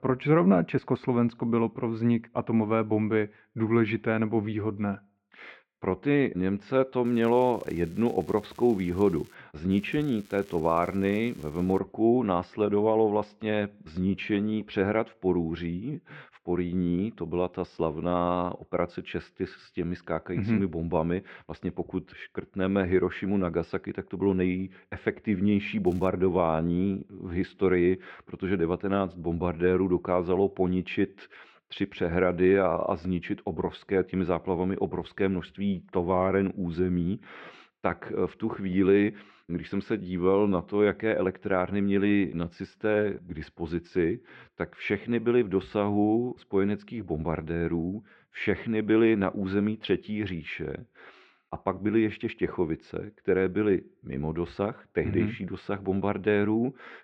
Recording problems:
muffled; very; fading above 2.5 kHz
crackling; faint; from 7 to 9.5 s, from 9.5 to 12 s and at 26 s; 30 dB below the speech

